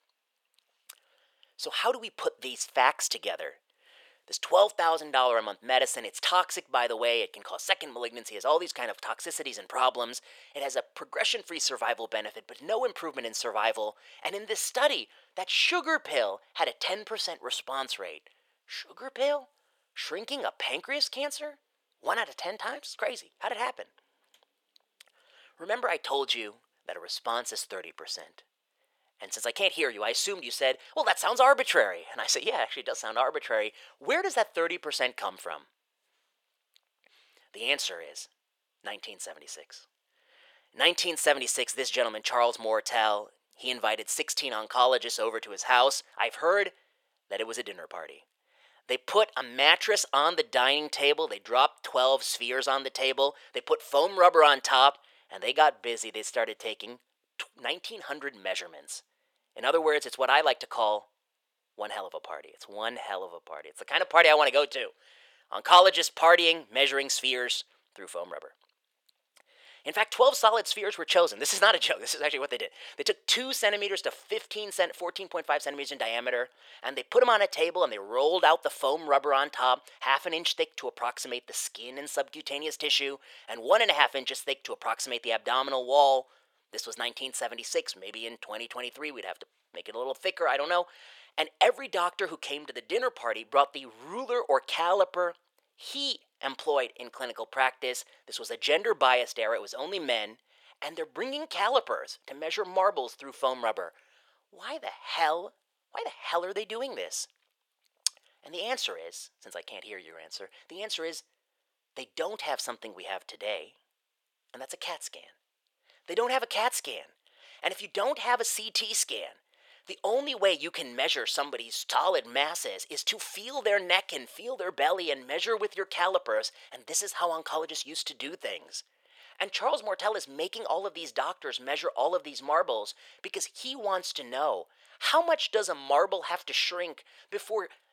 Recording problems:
thin; very; fading below 500 Hz

